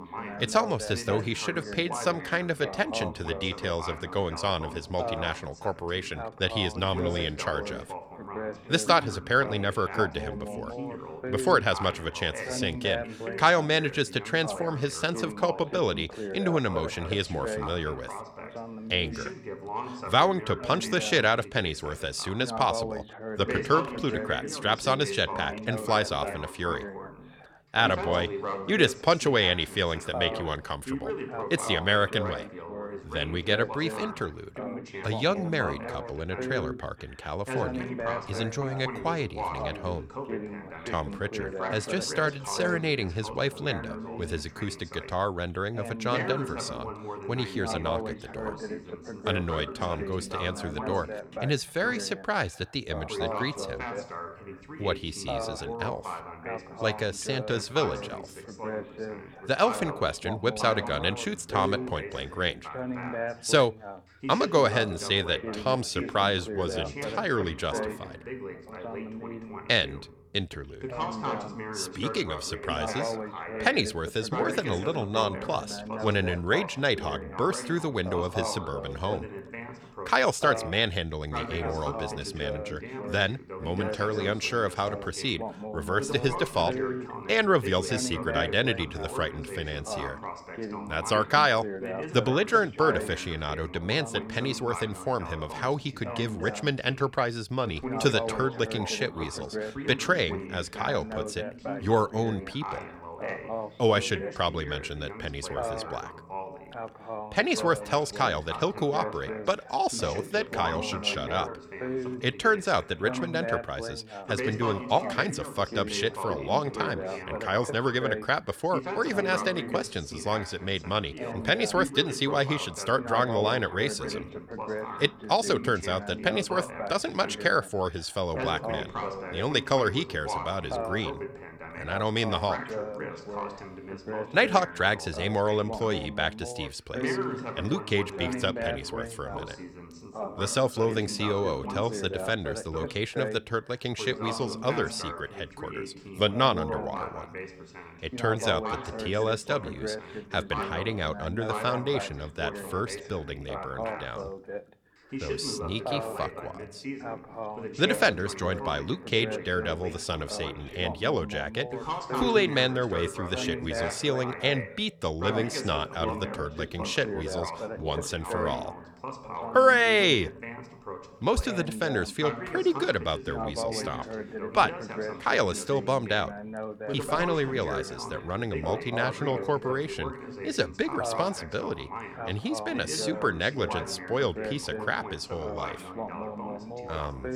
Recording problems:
background chatter; loud; throughout; 2 voices, 8 dB below the speech

